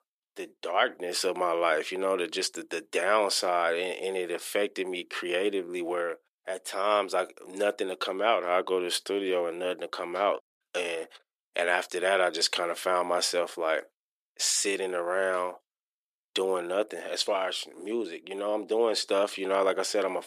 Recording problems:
thin; very; fading below 350 Hz

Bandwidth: 14.5 kHz